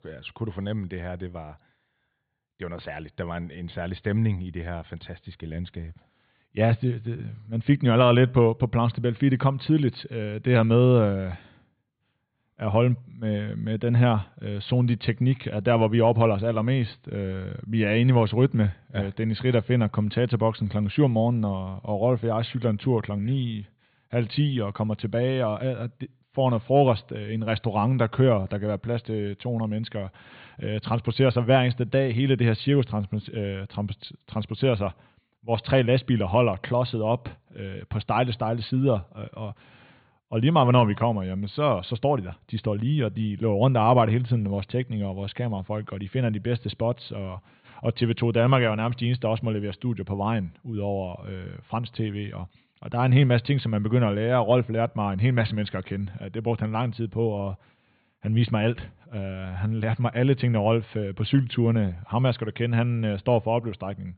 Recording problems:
high frequencies cut off; severe; nothing above 4.5 kHz

